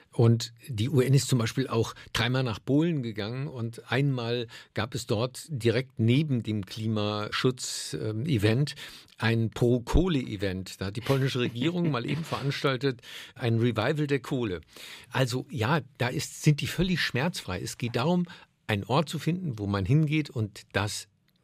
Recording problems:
none

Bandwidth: 15 kHz